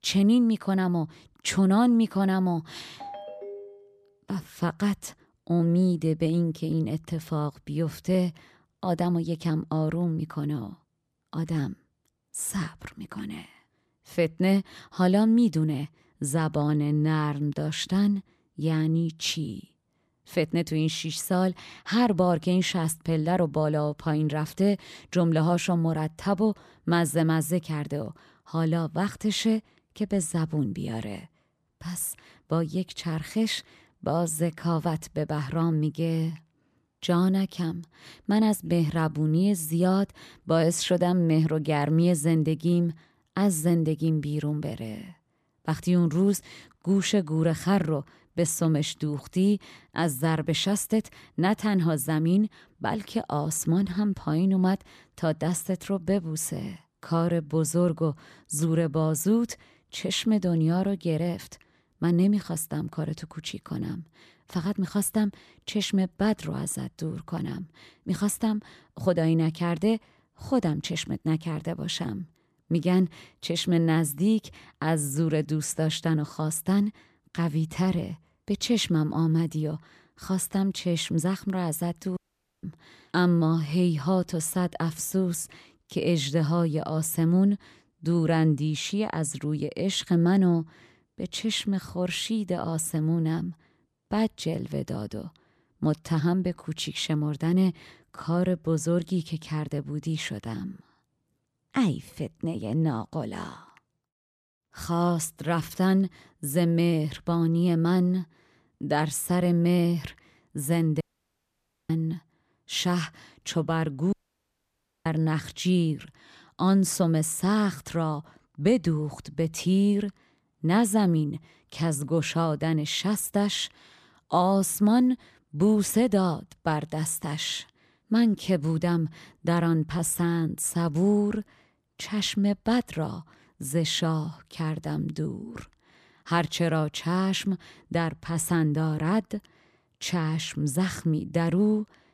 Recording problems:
phone ringing; faint; at 3 s; peak 15 dB below the speech
audio cutting out; at 1:22, at 1:51 for 1 s and at 1:54 for 1 s

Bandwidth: 14.5 kHz